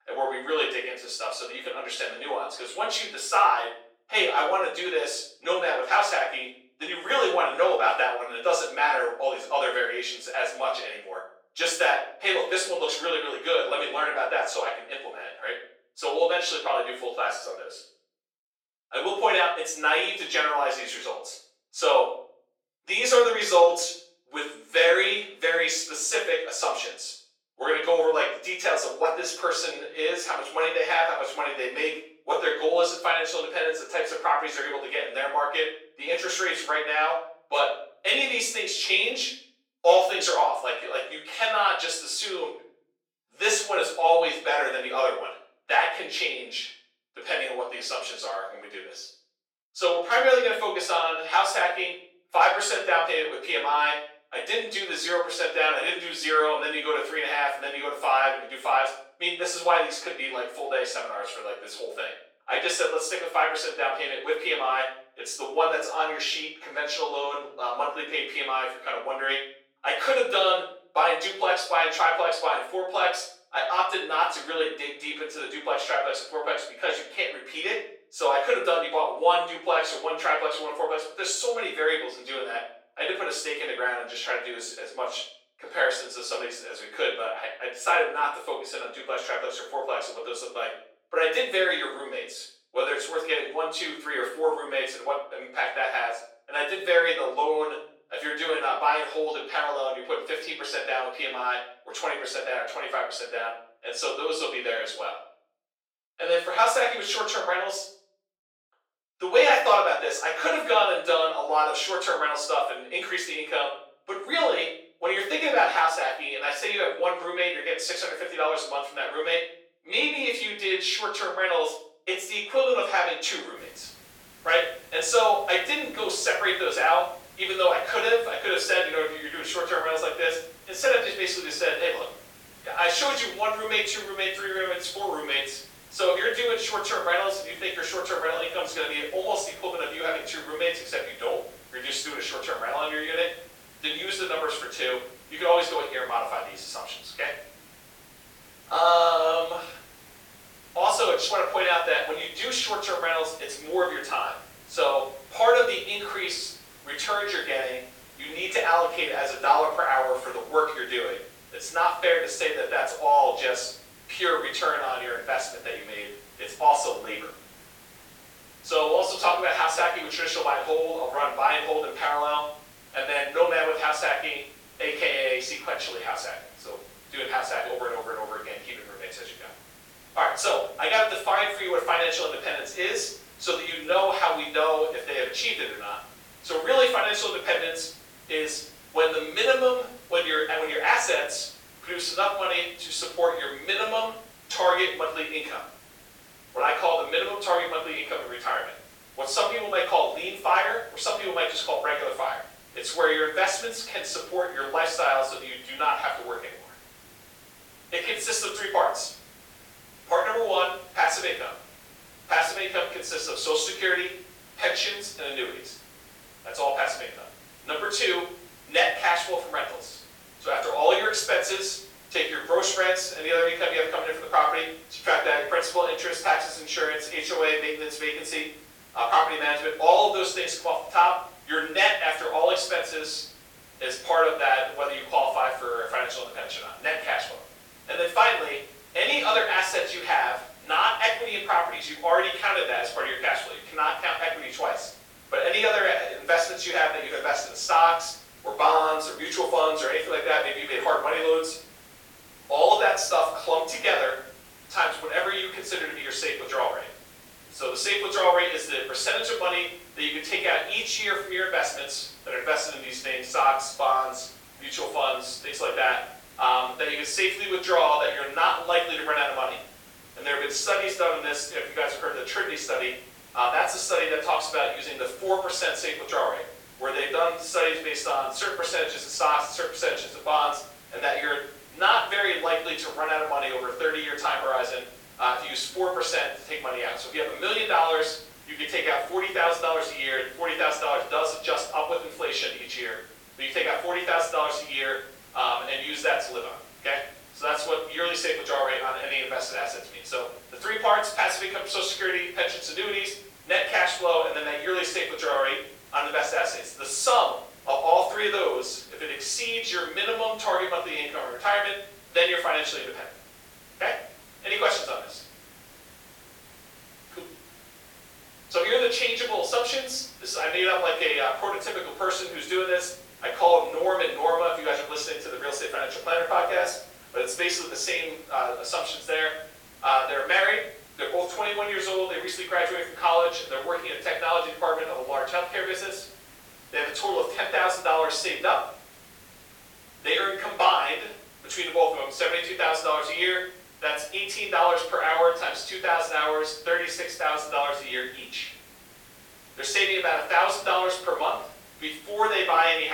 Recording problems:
off-mic speech; far
thin; very; fading below 400 Hz
room echo; noticeable; dies away in 0.6 s
hiss; faint; from 2:04 on; 25 dB below the speech
abrupt cut into speech; at the end

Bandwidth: 18 kHz